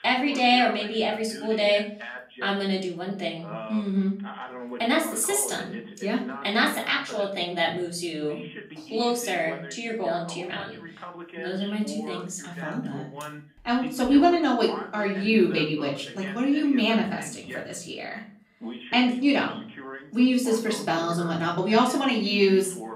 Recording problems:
off-mic speech; far
room echo; slight; dies away in 0.4 s
voice in the background; noticeable; throughout; 15 dB below the speech

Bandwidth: 15.5 kHz